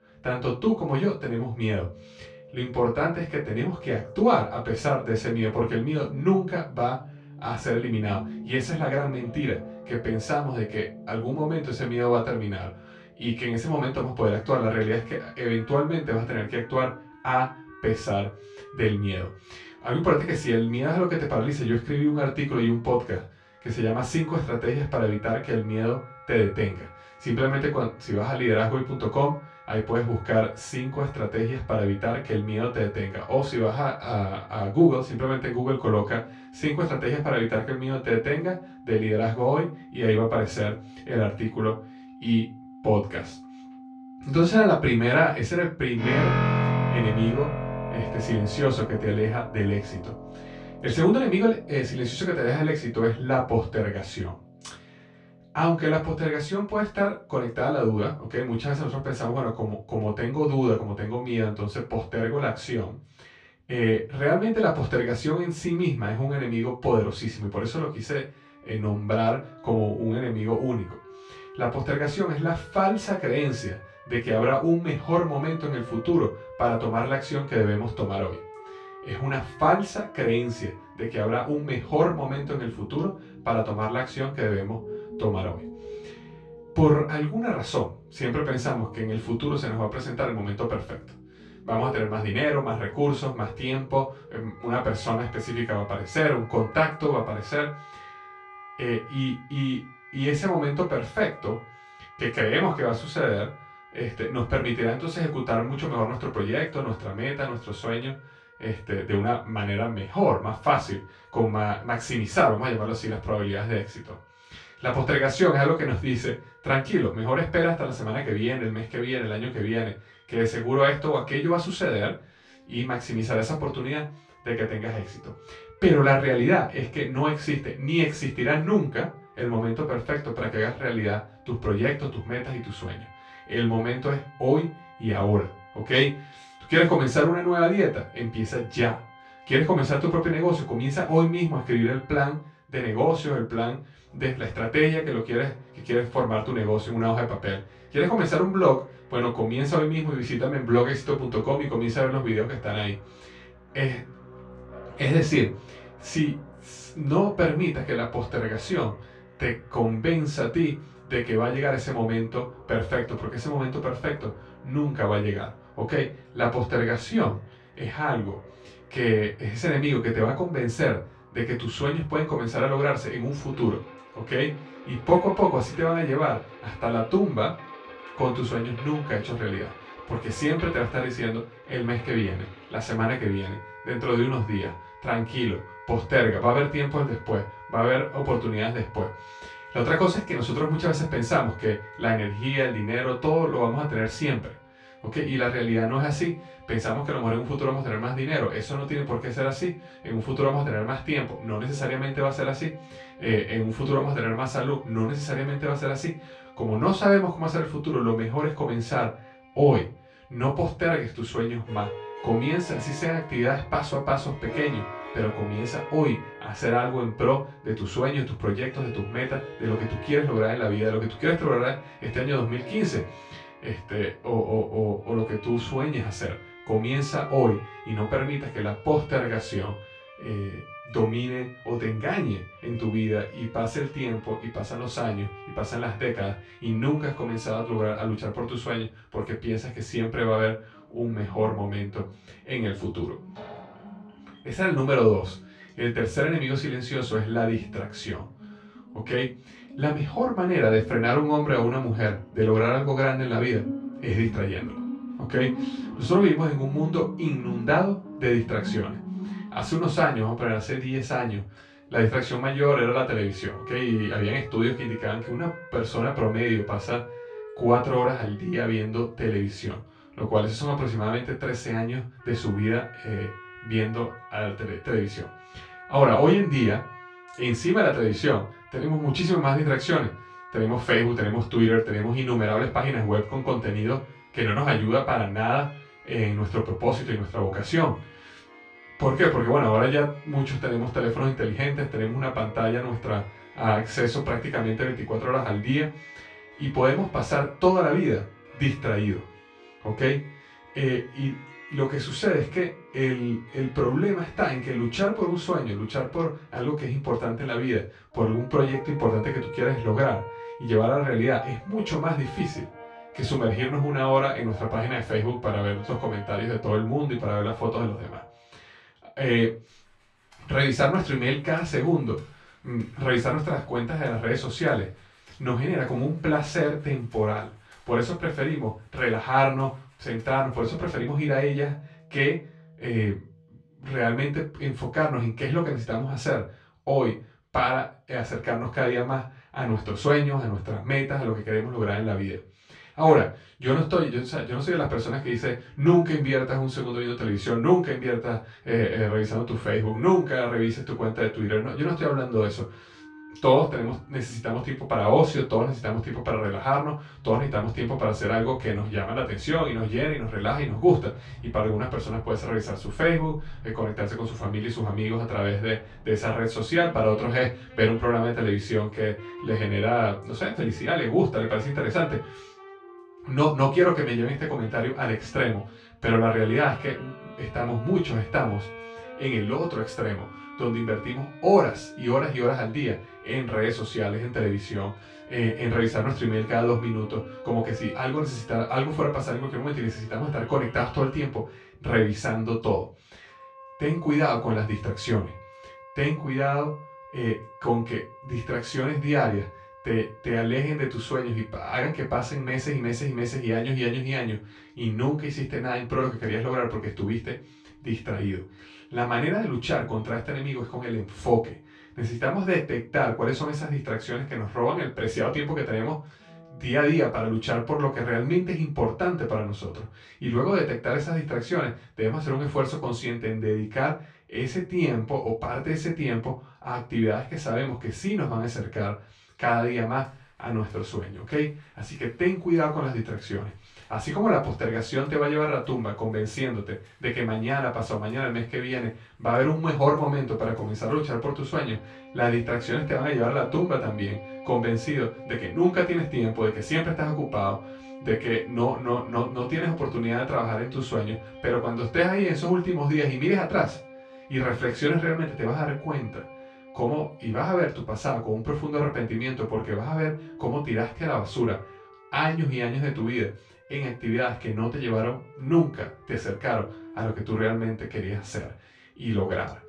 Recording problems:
off-mic speech; far
room echo; slight; dies away in 0.3 s
background music; noticeable; throughout; 15 dB below the speech

